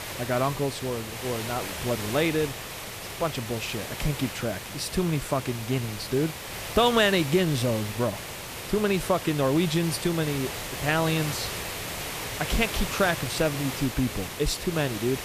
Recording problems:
hiss; loud; throughout; 7 dB below the speech

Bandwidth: 14.5 kHz